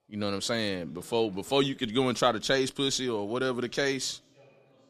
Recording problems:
background chatter; faint; throughout; 2 voices, 30 dB below the speech

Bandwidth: 14 kHz